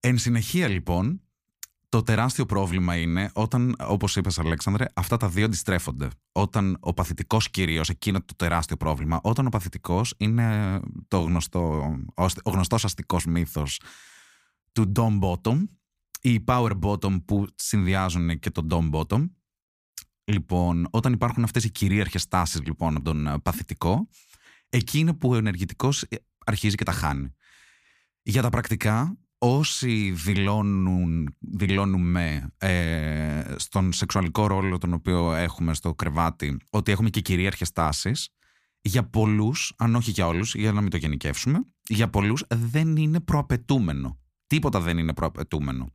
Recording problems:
none

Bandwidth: 15 kHz